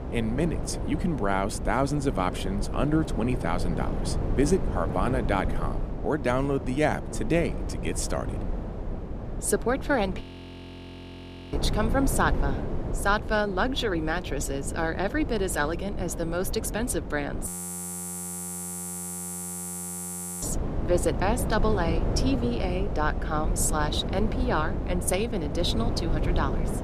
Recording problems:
wind noise on the microphone; heavy; 9 dB below the speech
audio freezing; at 10 s for 1.5 s and at 17 s for 3 s

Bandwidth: 14.5 kHz